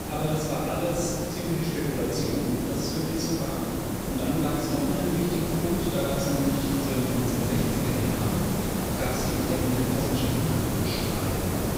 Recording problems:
room echo; strong; dies away in 2.4 s
off-mic speech; far
hiss; loud; throughout; 1 dB below the speech

